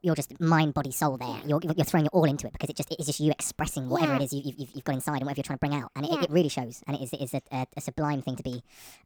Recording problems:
wrong speed and pitch; too fast and too high; 1.5 times normal speed

